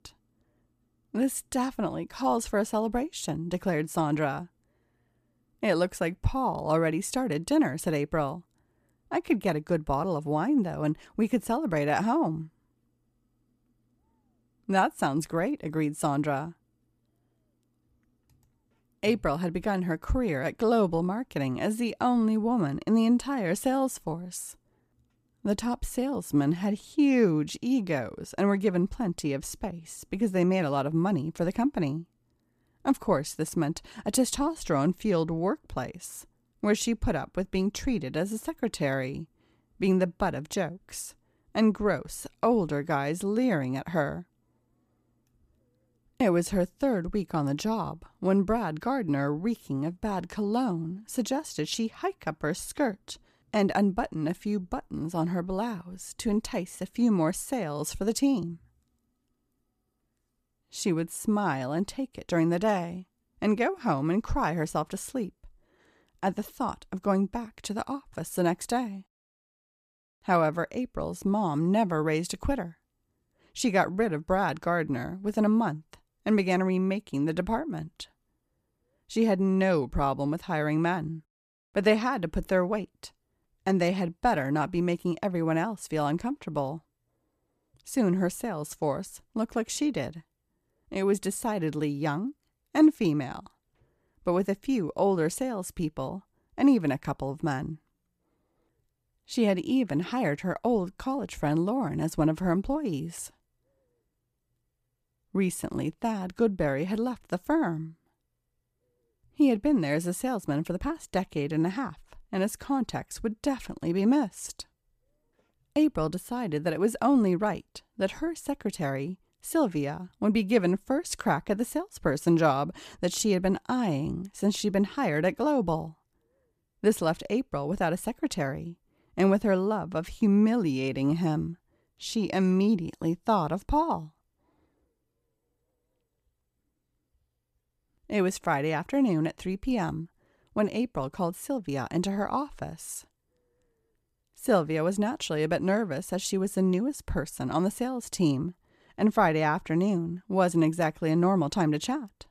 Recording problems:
none

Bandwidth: 14.5 kHz